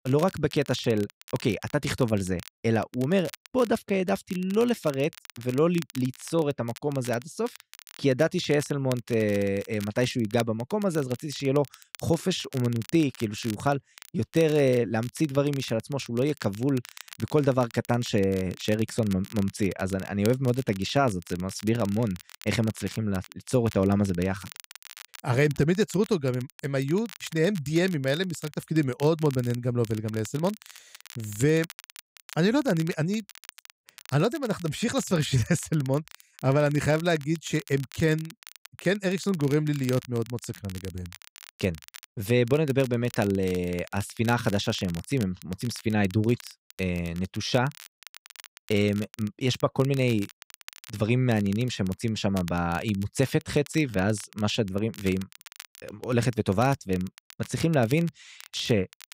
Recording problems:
crackle, like an old record; noticeable; 20 dB below the speech

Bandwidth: 15.5 kHz